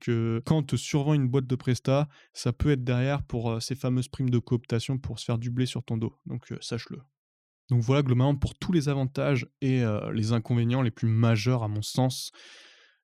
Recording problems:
none

